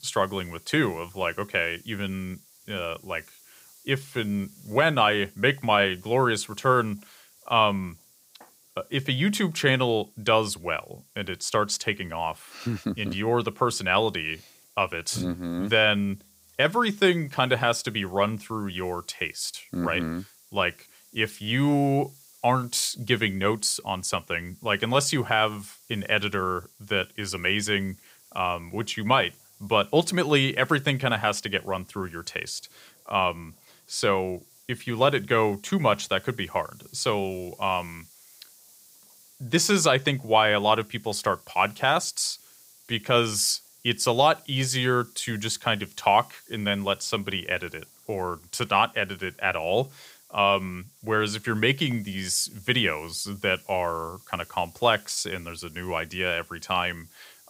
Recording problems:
hiss; faint; throughout; 25 dB below the speech

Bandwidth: 15.5 kHz